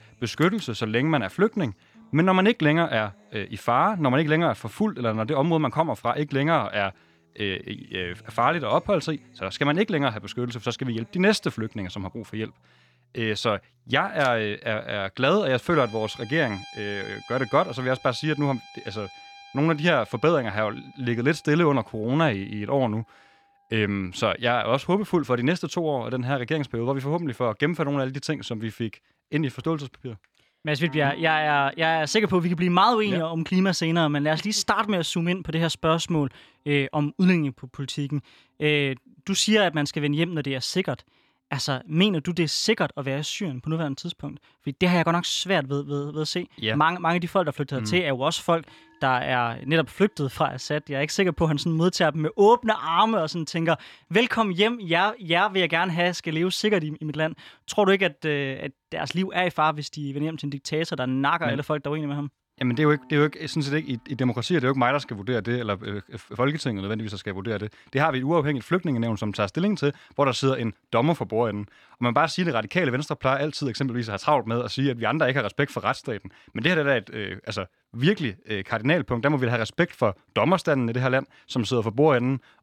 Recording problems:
background music; faint; throughout; 25 dB below the speech

